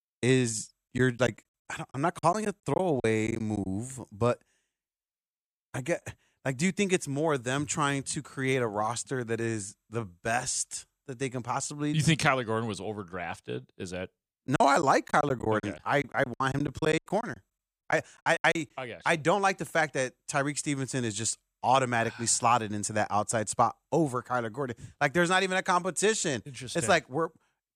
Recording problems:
choppy; very; from 1 to 3.5 s and from 14 to 19 s; 16% of the speech affected

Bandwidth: 15 kHz